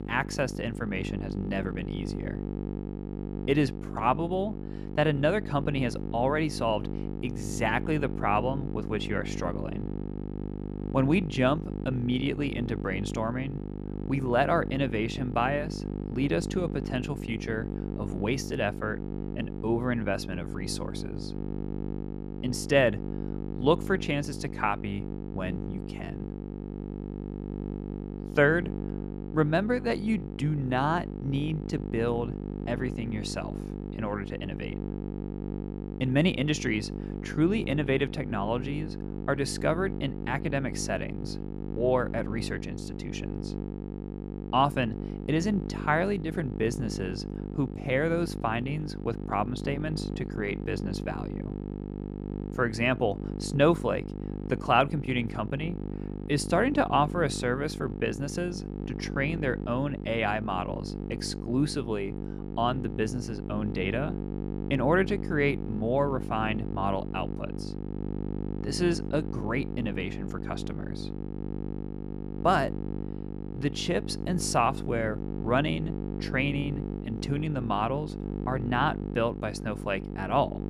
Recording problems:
electrical hum; noticeable; throughout; 50 Hz, 10 dB below the speech

